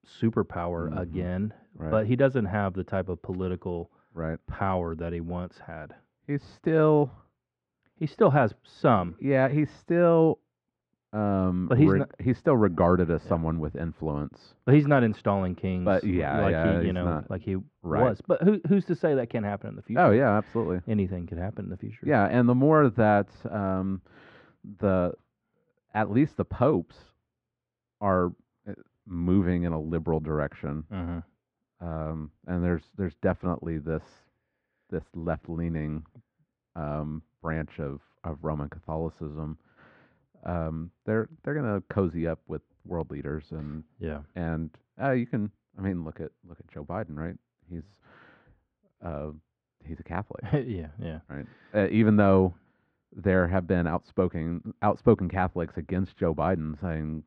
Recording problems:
muffled; very; fading above 1.5 kHz

